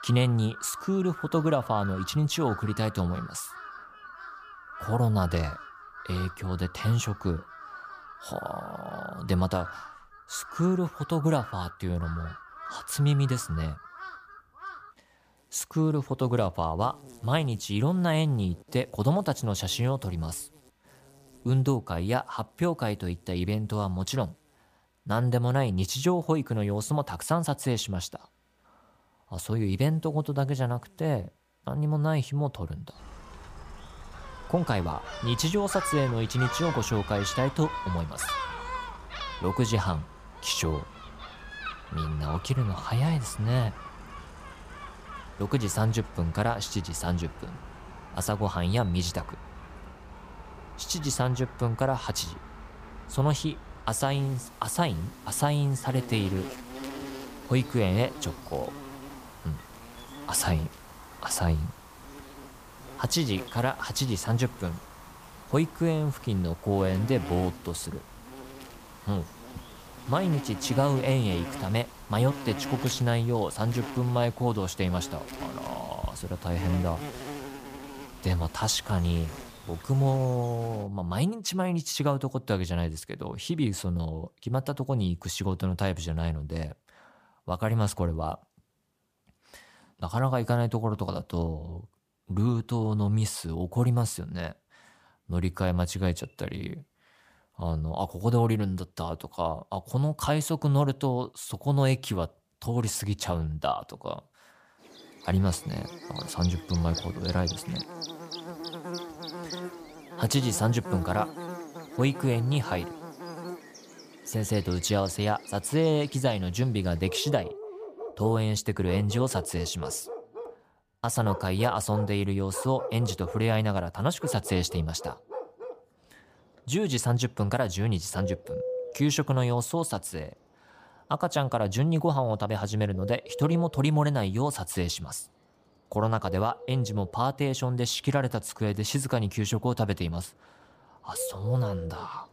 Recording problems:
animal sounds; noticeable; throughout; 10 dB below the speech

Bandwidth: 15 kHz